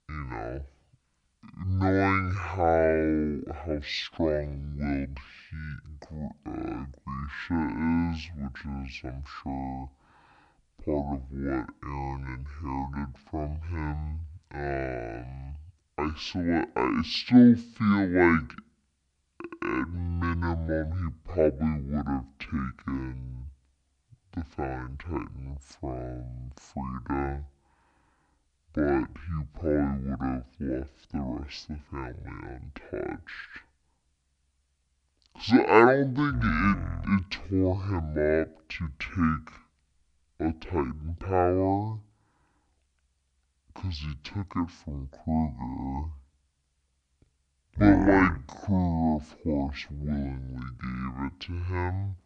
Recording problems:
wrong speed and pitch; too slow and too low; 0.5 times normal speed

